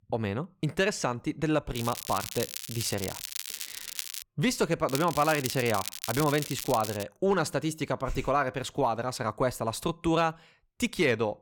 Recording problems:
crackling; loud; from 1.5 to 4 s and from 5 to 7 s; 7 dB below the speech

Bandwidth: 18.5 kHz